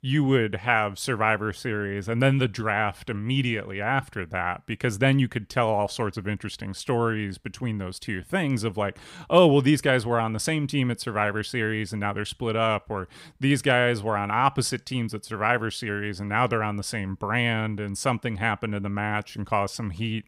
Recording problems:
none

